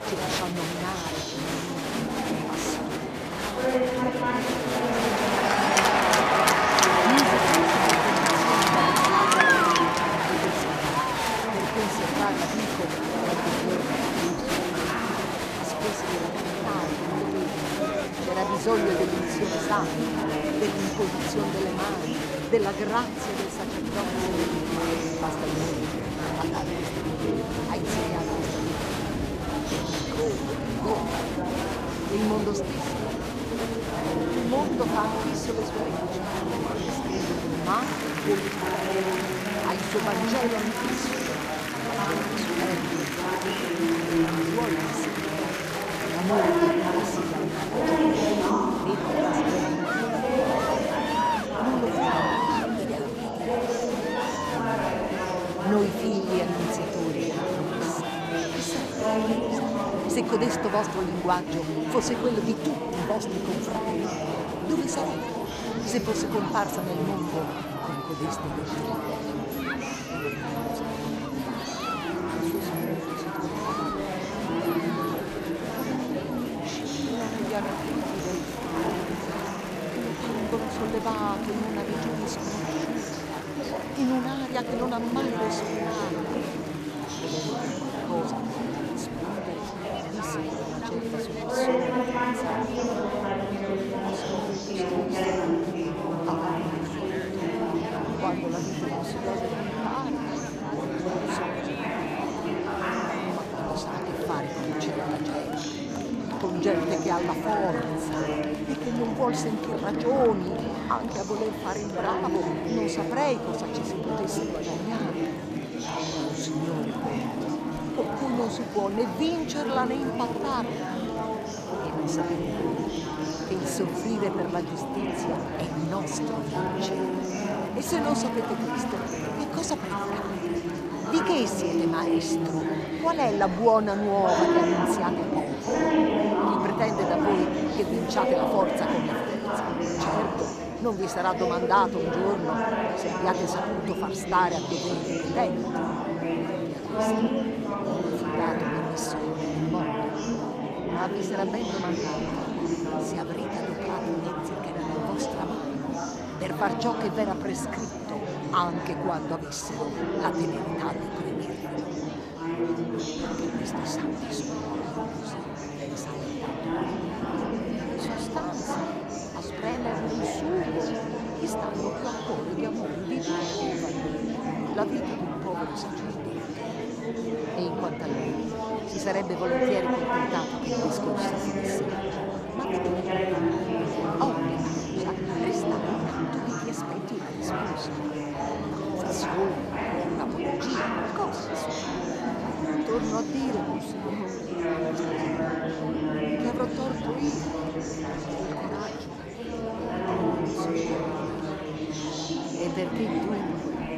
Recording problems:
murmuring crowd; very loud; throughout; 4 dB above the speech

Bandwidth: 14.5 kHz